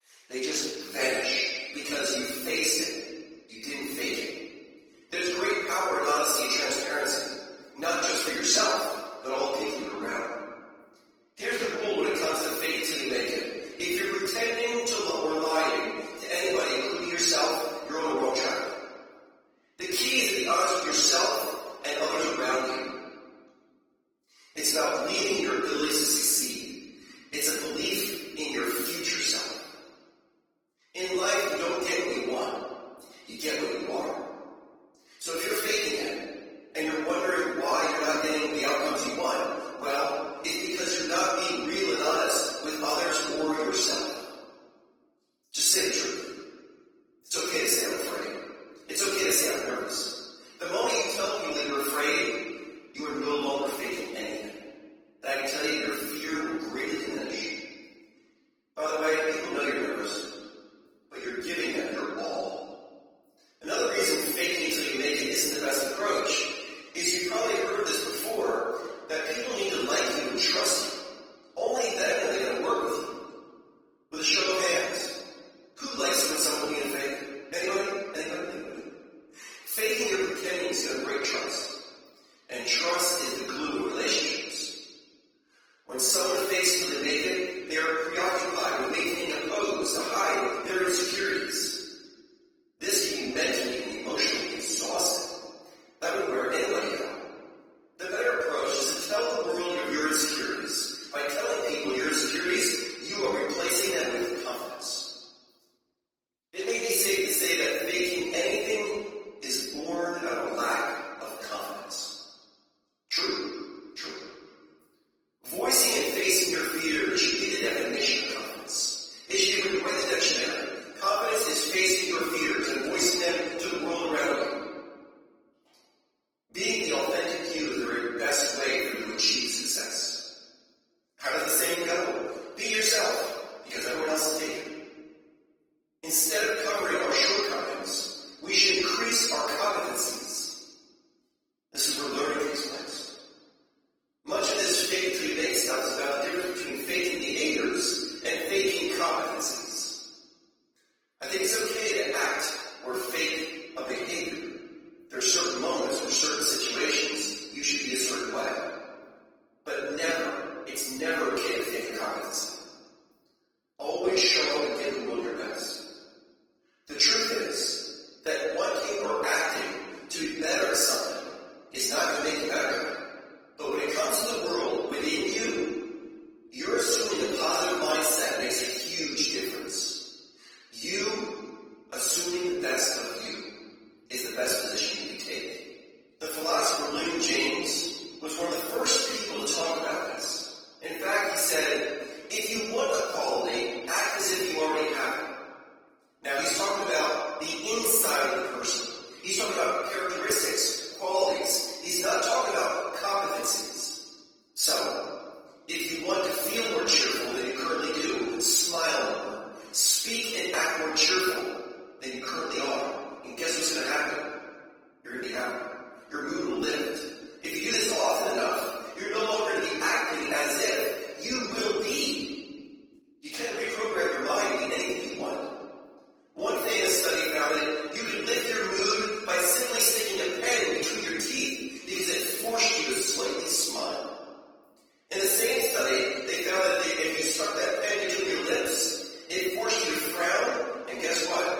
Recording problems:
room echo; strong; dies away in 1.4 s
off-mic speech; far
thin; somewhat; fading below 350 Hz
garbled, watery; slightly

